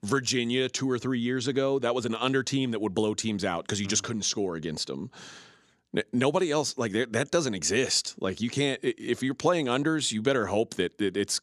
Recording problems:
none

